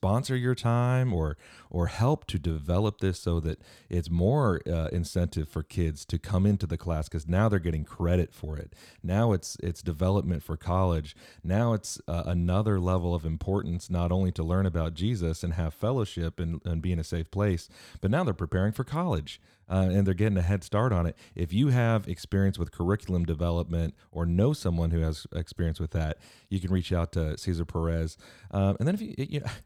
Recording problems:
none

